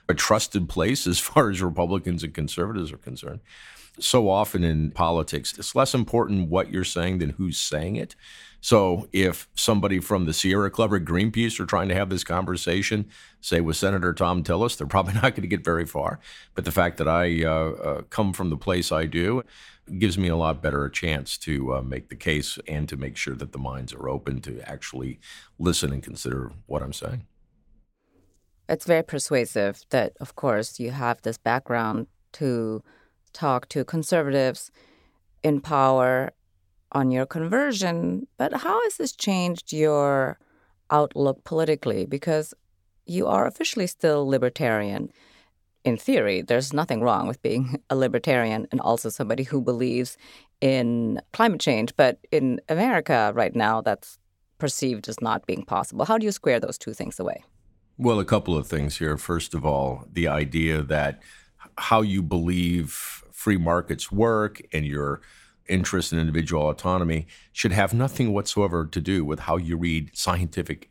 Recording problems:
none

